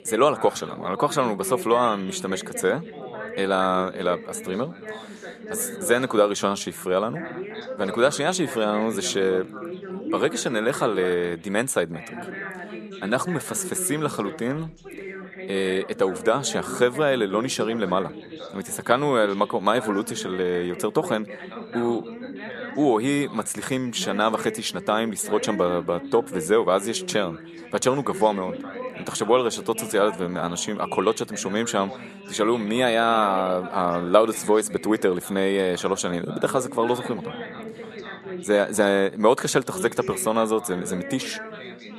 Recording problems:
background chatter; noticeable; throughout; 3 voices, 10 dB below the speech

